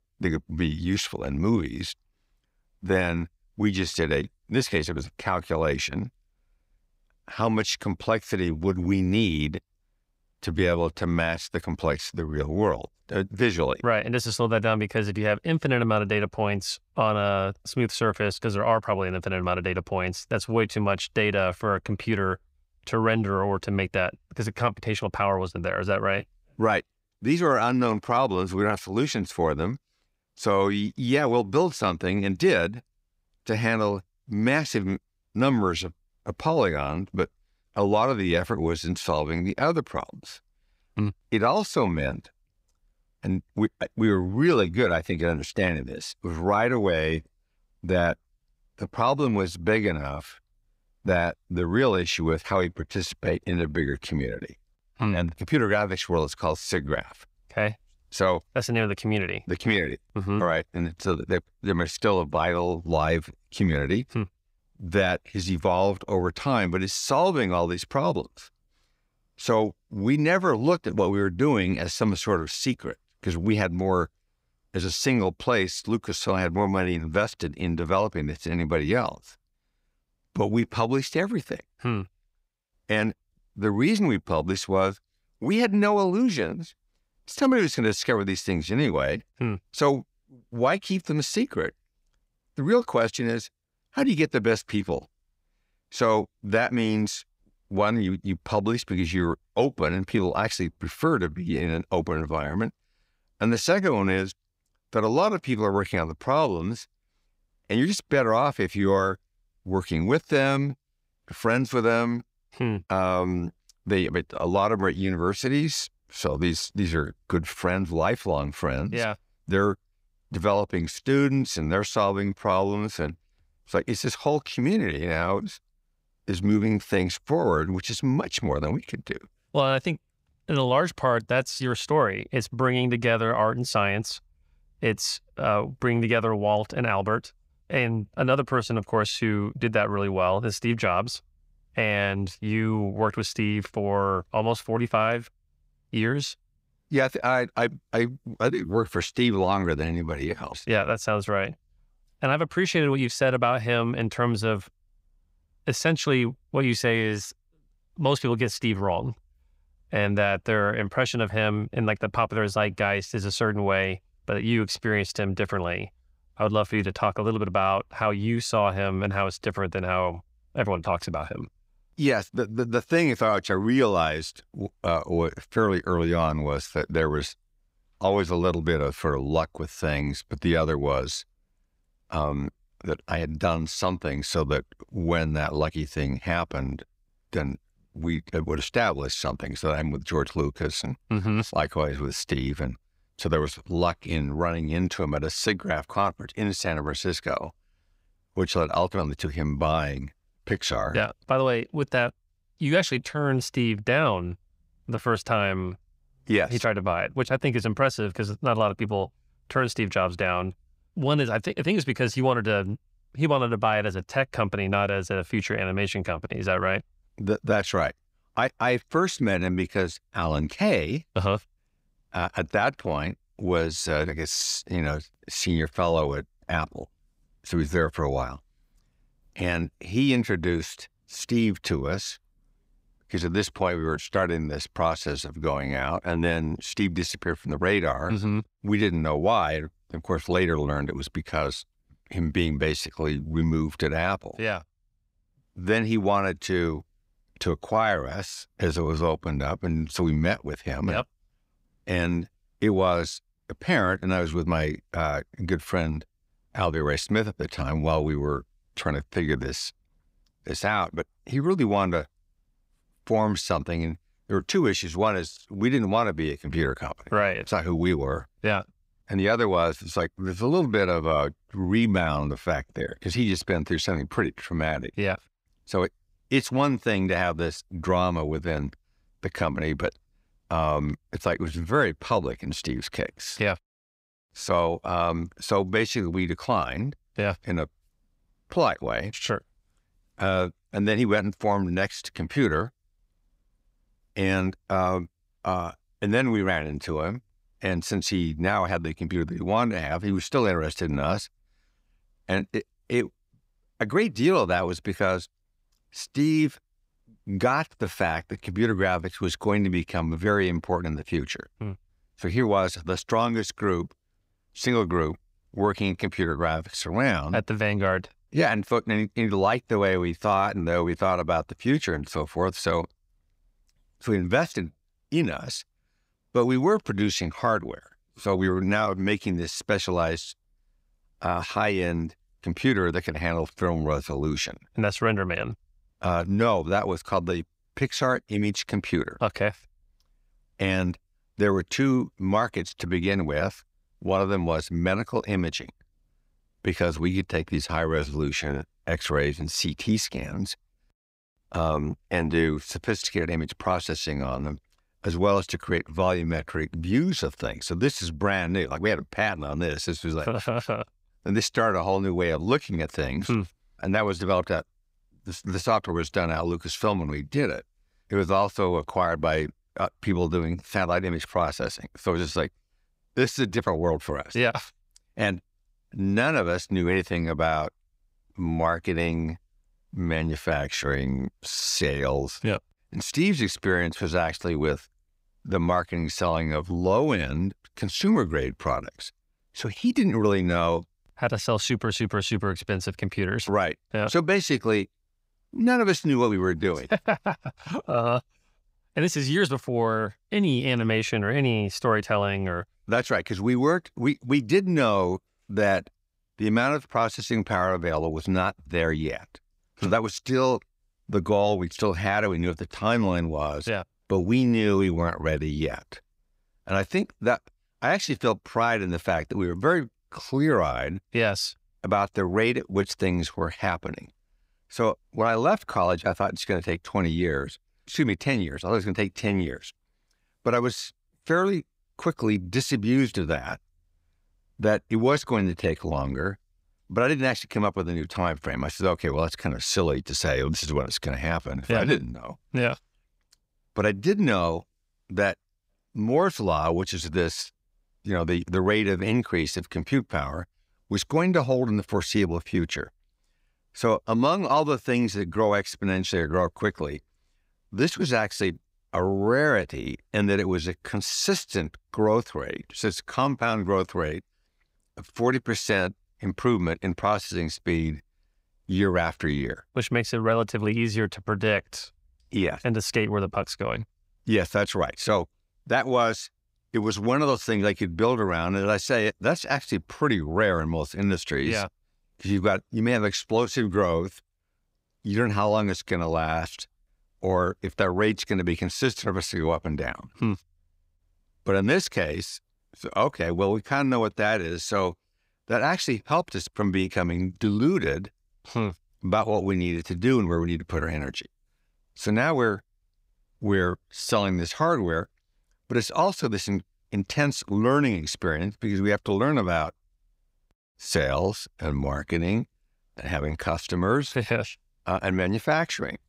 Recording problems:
none

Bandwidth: 15.5 kHz